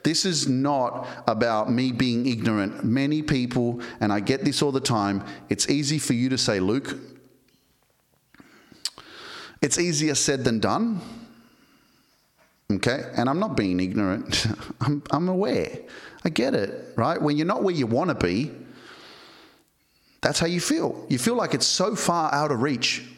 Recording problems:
squashed, flat; heavily

